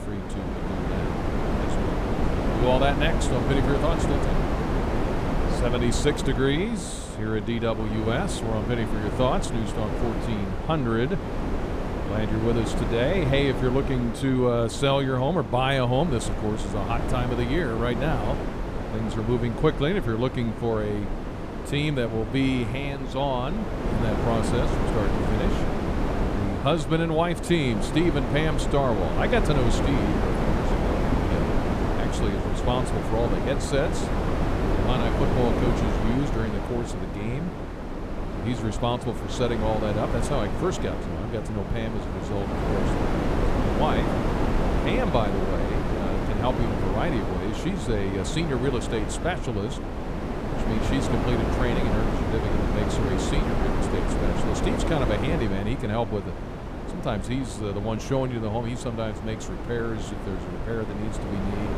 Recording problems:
wind noise on the microphone; heavy; 2 dB below the speech

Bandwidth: 14.5 kHz